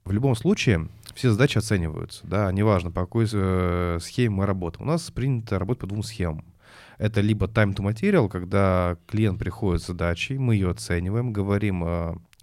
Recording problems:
none

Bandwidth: 16 kHz